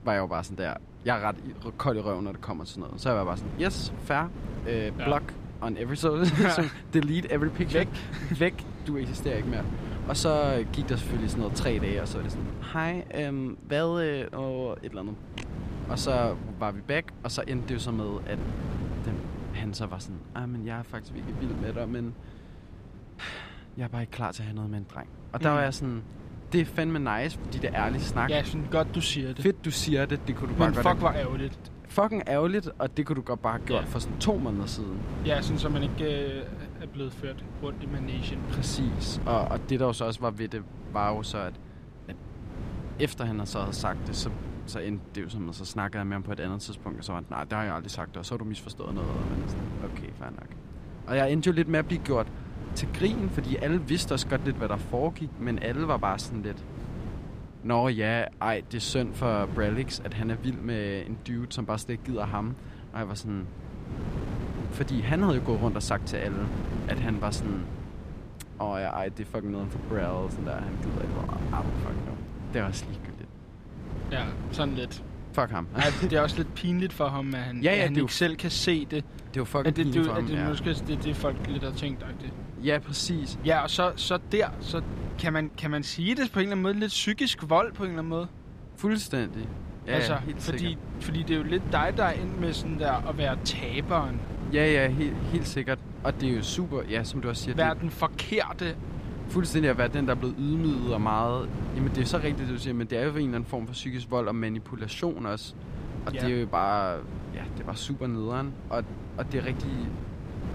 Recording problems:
wind noise on the microphone; occasional gusts; 15 dB below the speech

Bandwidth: 14.5 kHz